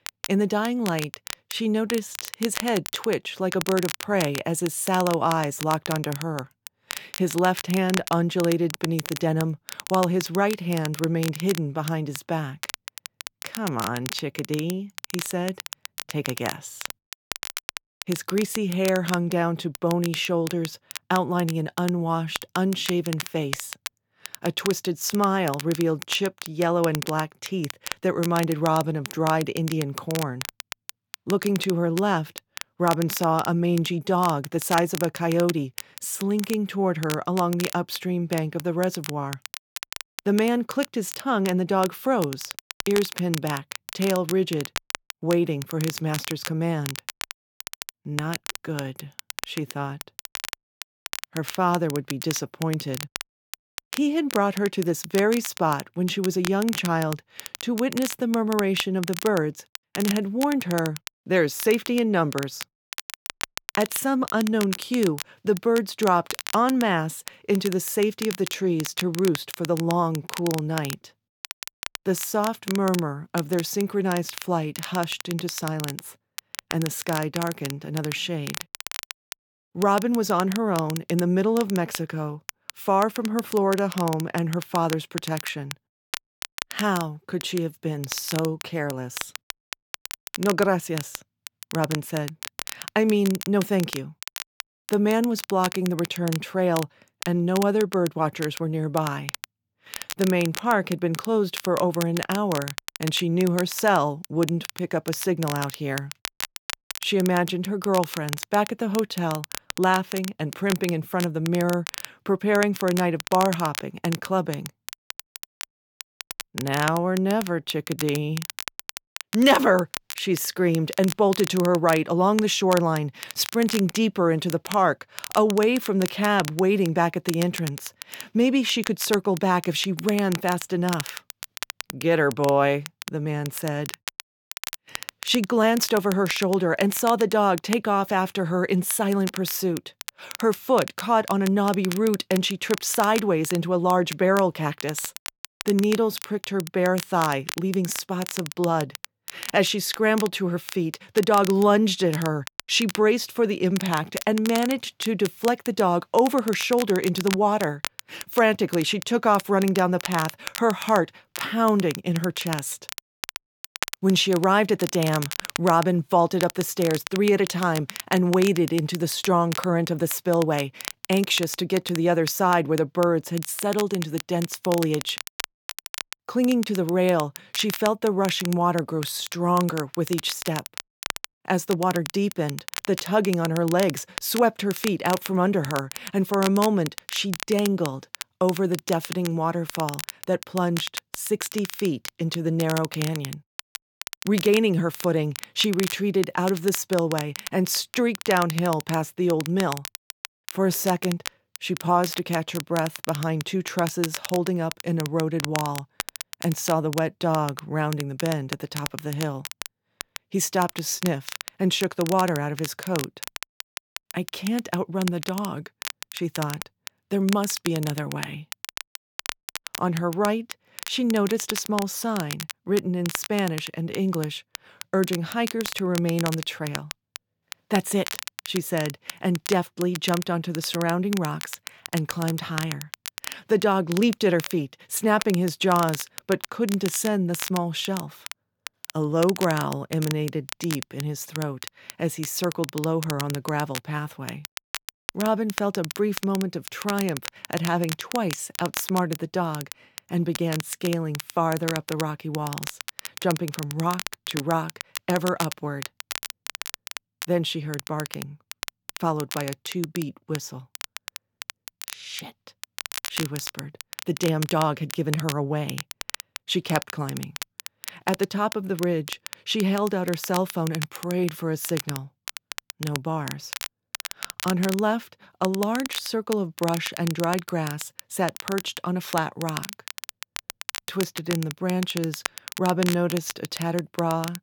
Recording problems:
crackle, like an old record; noticeable; 10 dB below the speech

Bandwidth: 18.5 kHz